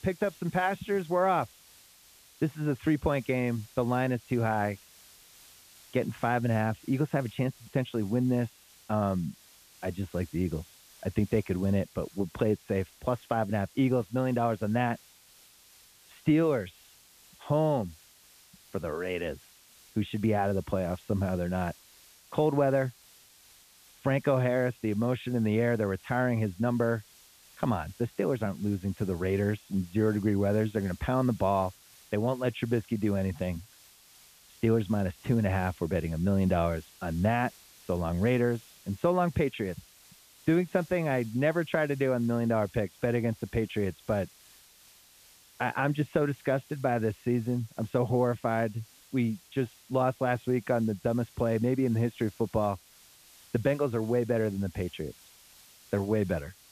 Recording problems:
high frequencies cut off; severe; nothing above 3.5 kHz
hiss; faint; throughout; 25 dB below the speech

